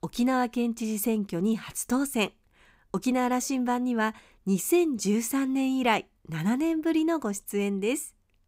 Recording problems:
none

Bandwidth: 15.5 kHz